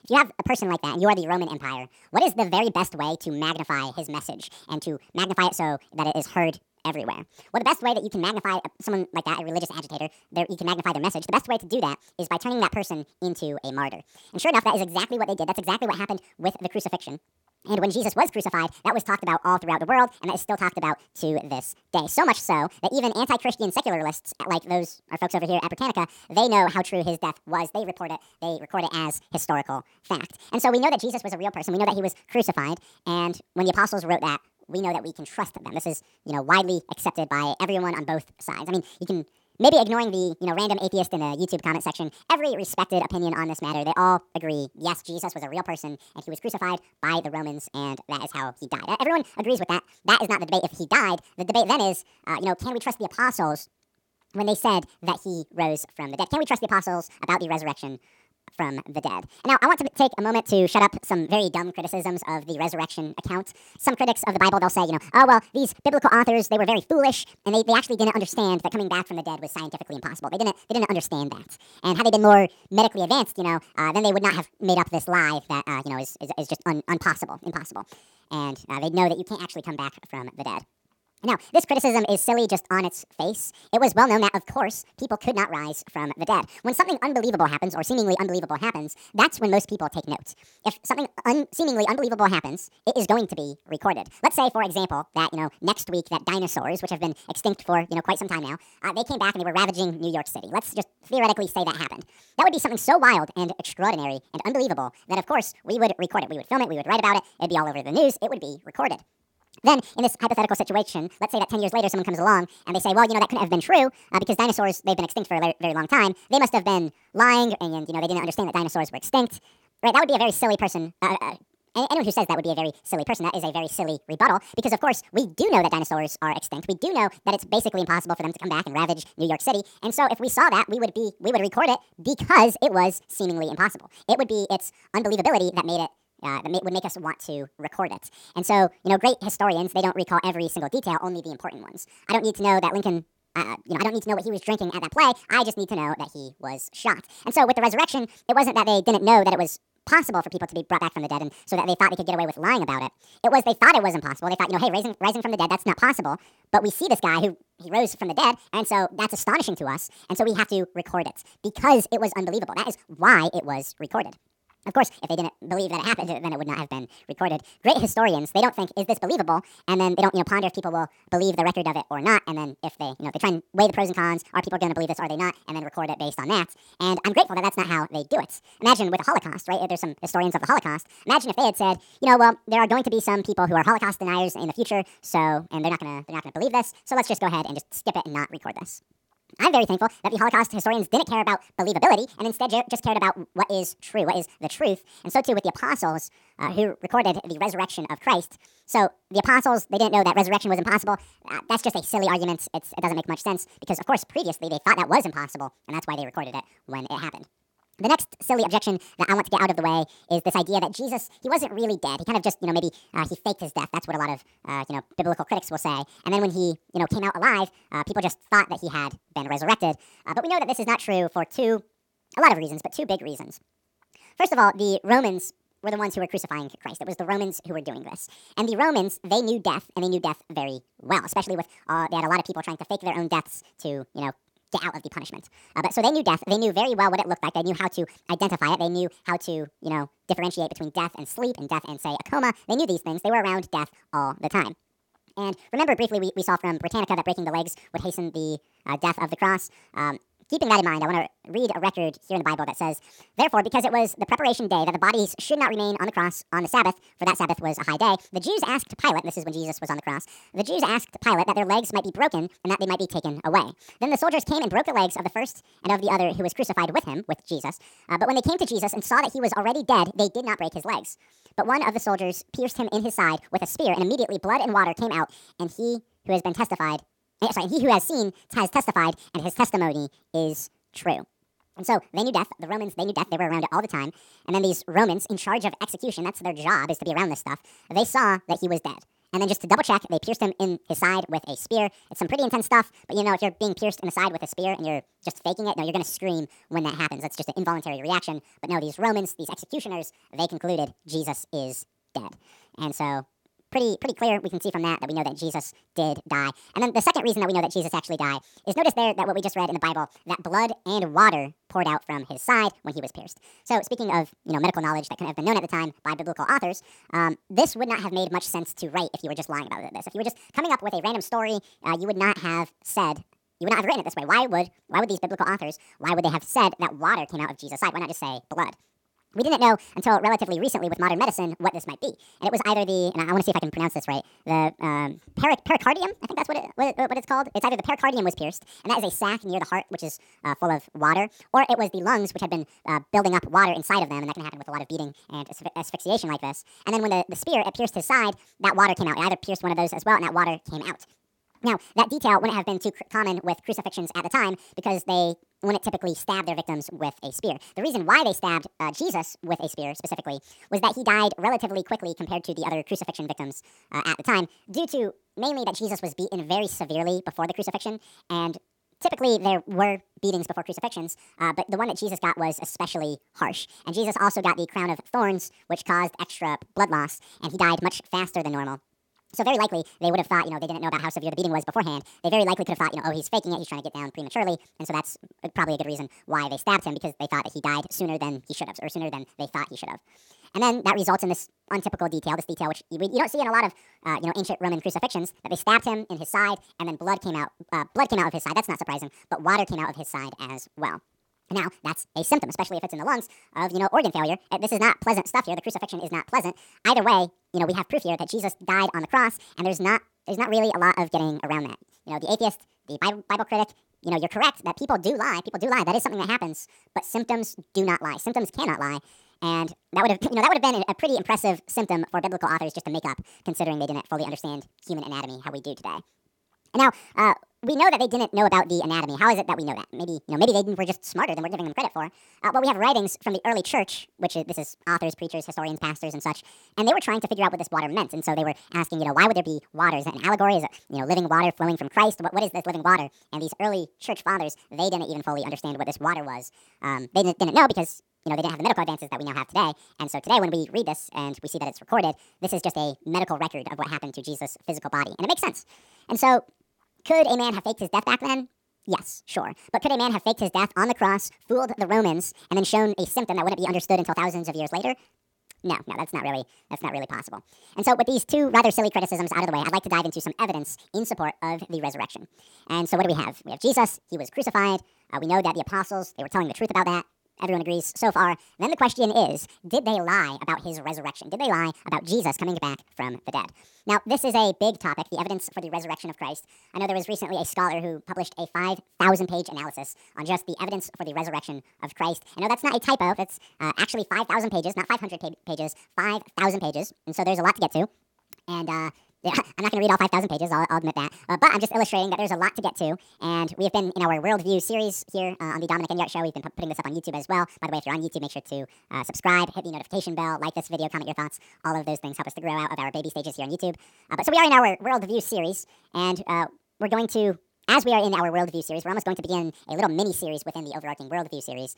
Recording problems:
wrong speed and pitch; too fast and too high; 1.7 times normal speed

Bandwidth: 17.5 kHz